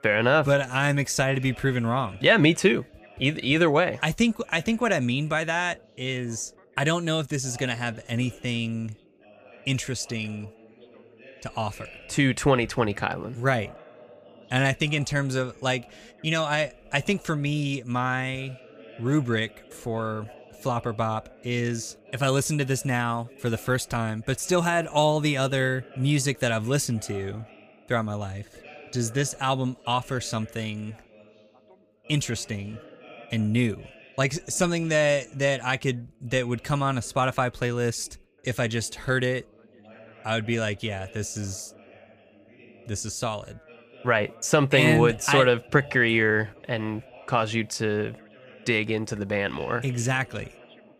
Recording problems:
background chatter; faint; throughout; 2 voices, 25 dB below the speech

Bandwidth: 15 kHz